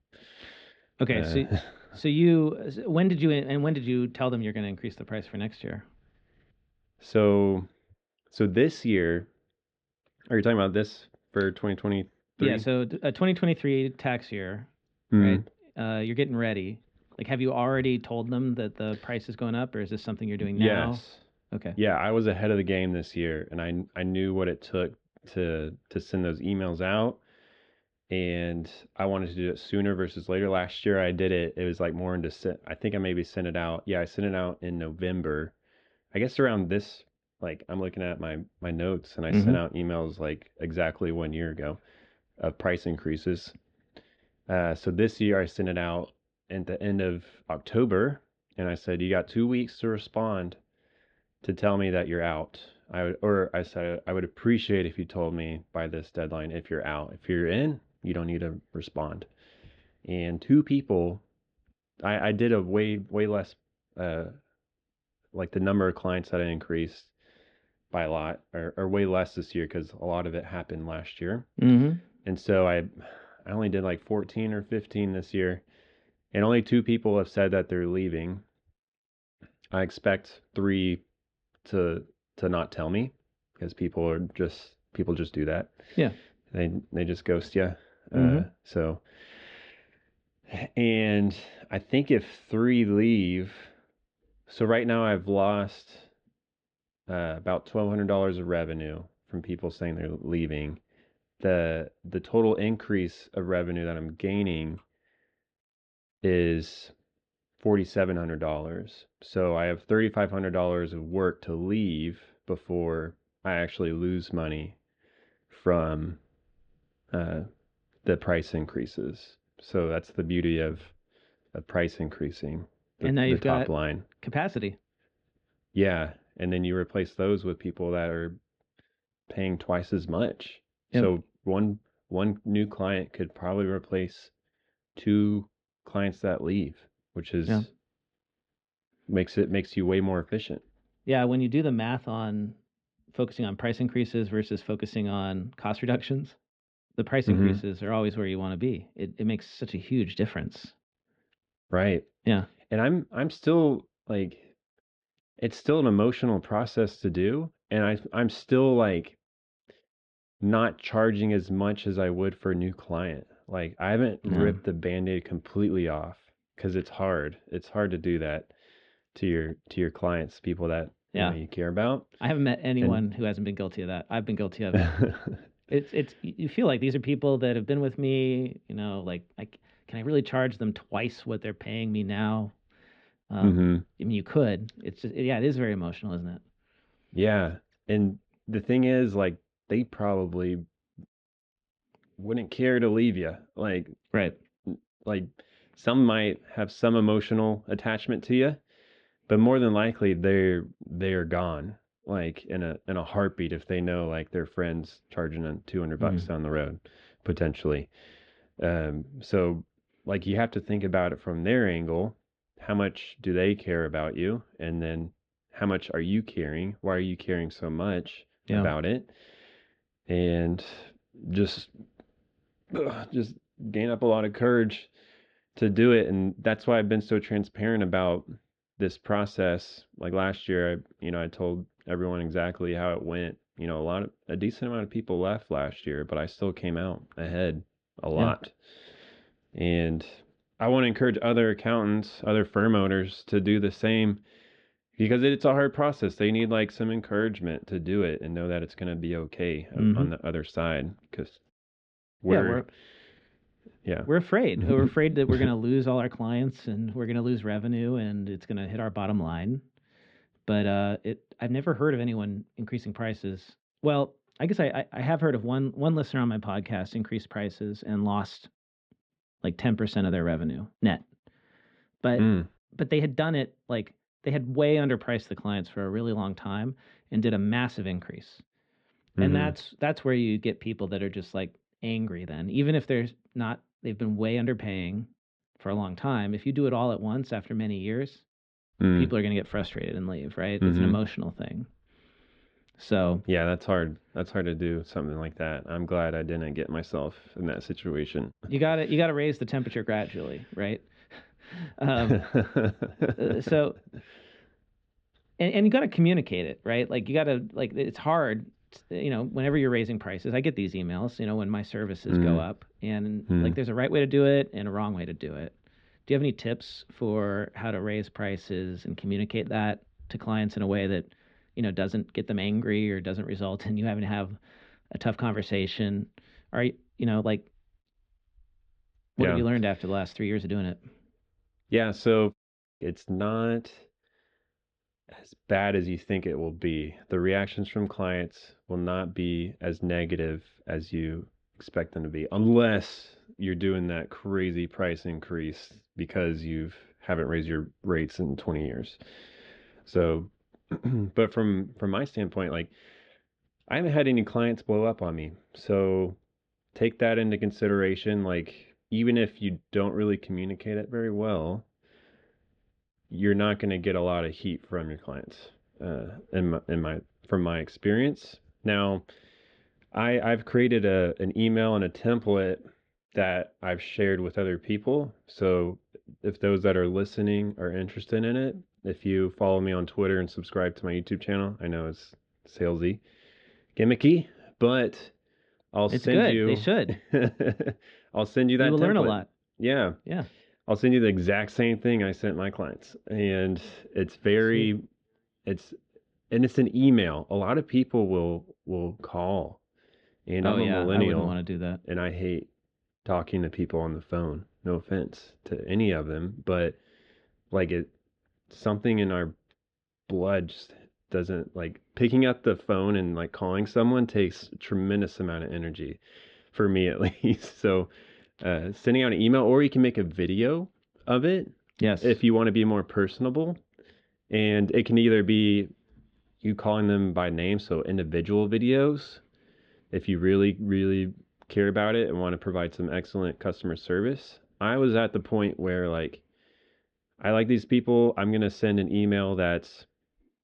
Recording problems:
muffled; slightly; fading above 3.5 kHz

